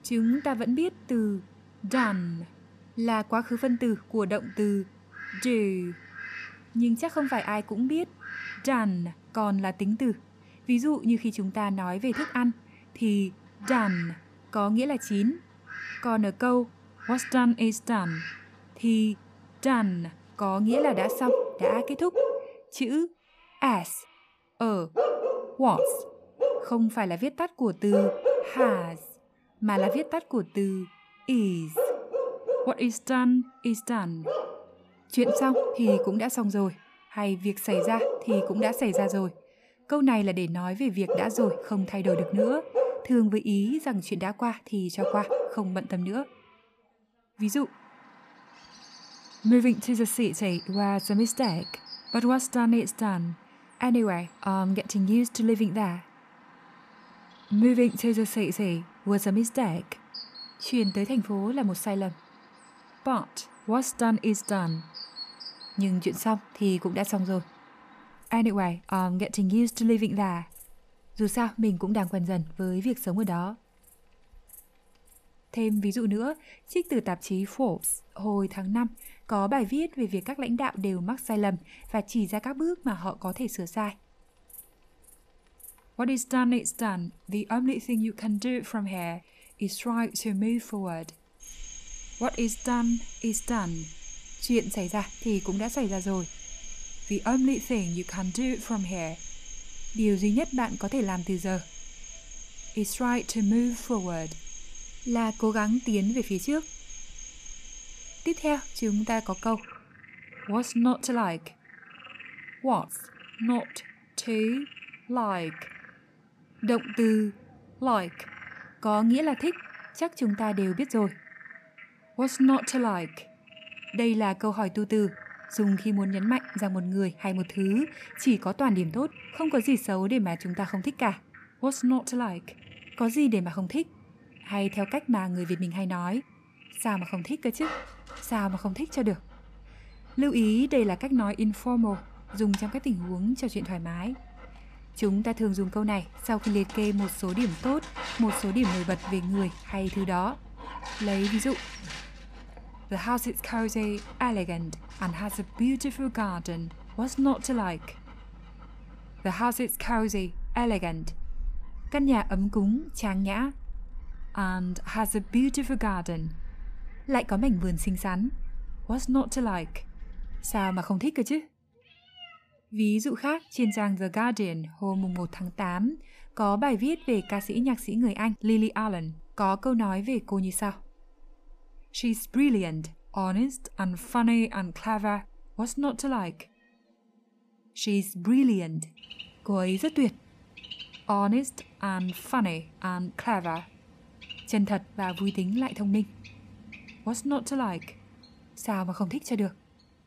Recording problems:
animal sounds; loud; throughout; 9 dB below the speech

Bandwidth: 14.5 kHz